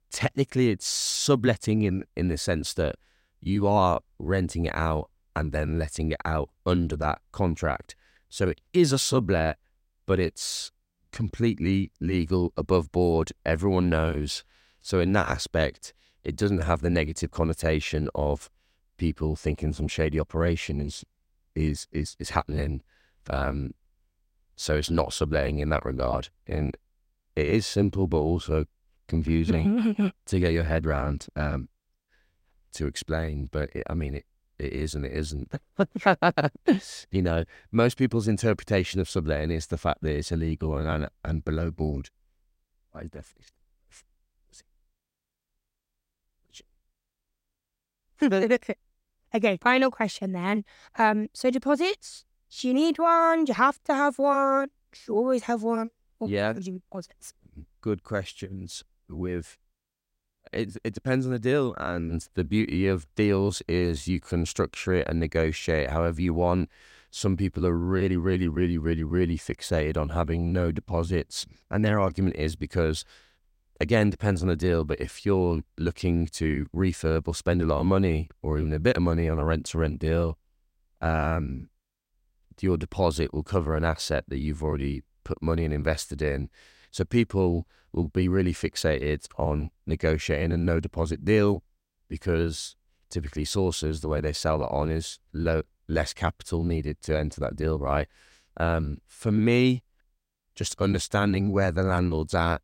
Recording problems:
none

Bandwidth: 16 kHz